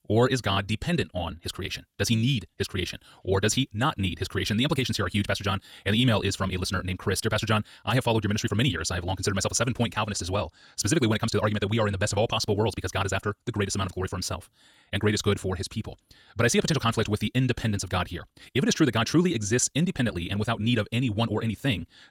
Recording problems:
wrong speed, natural pitch; too fast; 1.8 times normal speed

